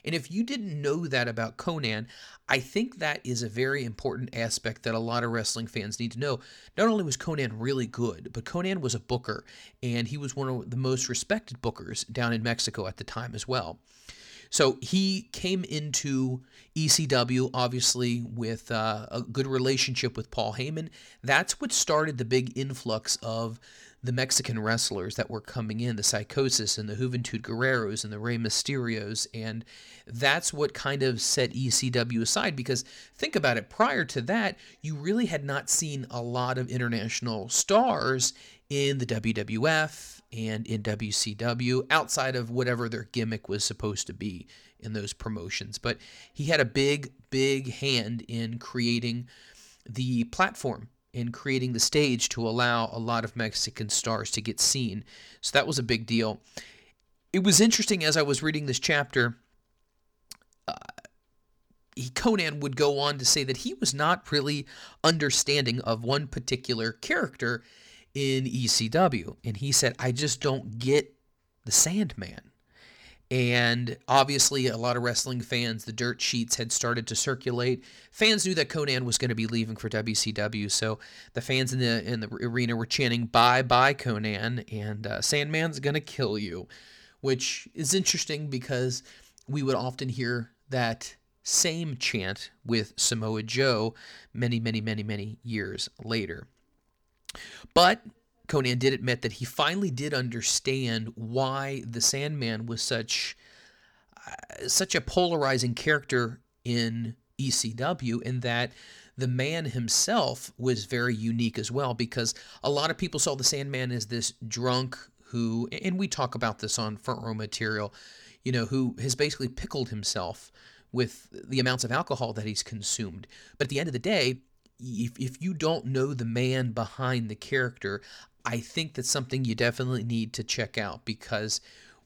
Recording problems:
uneven, jittery; strongly; from 4.5 s to 2:05

